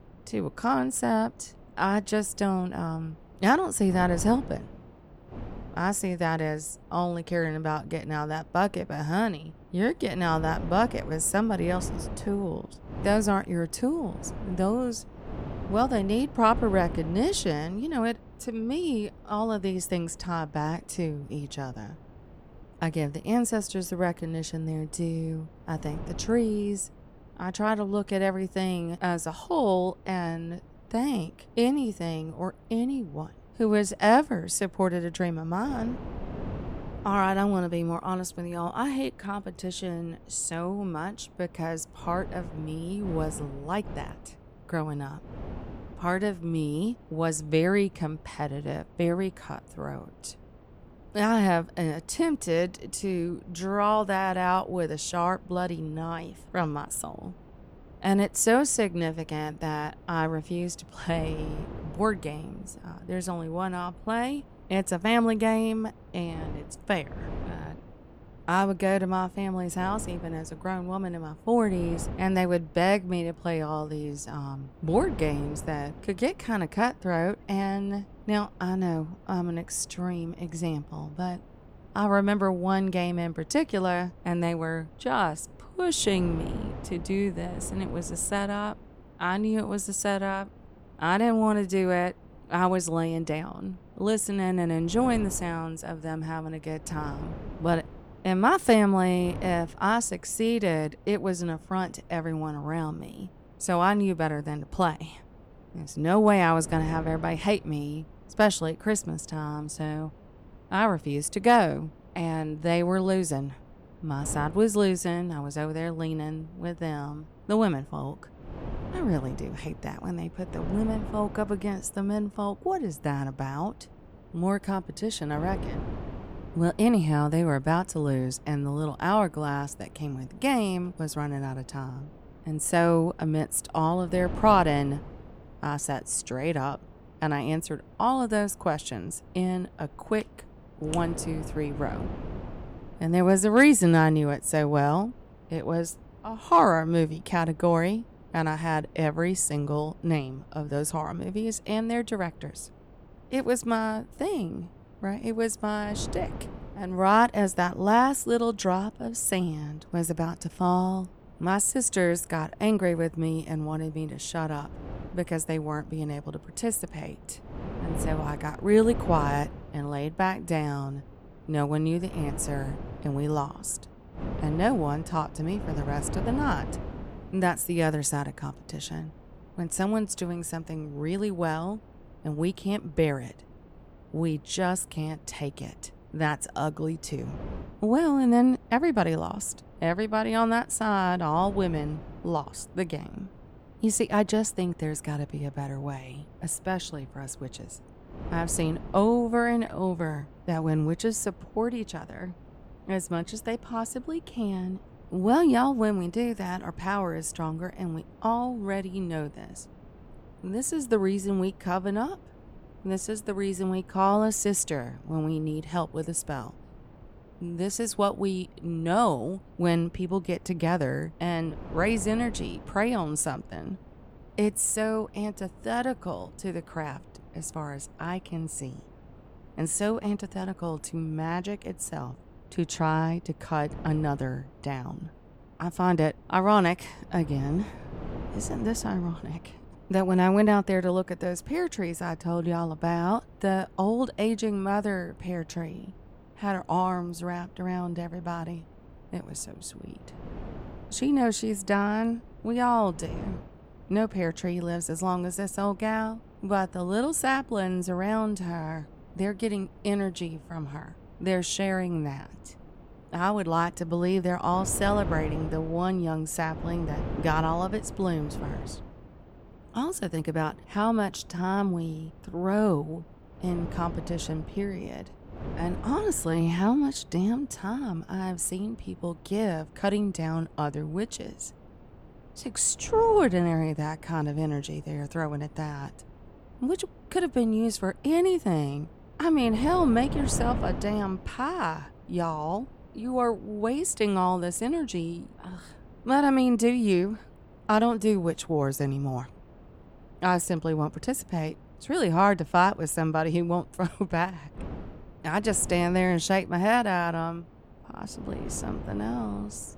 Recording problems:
wind noise on the microphone; occasional gusts; 20 dB below the speech

